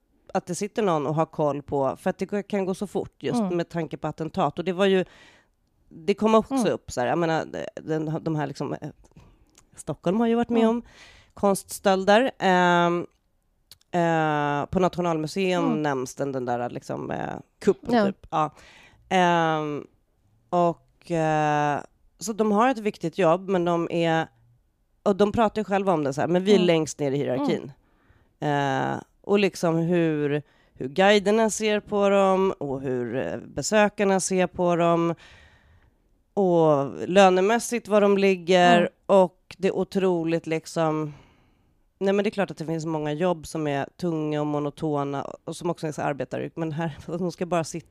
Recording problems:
none

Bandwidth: 15 kHz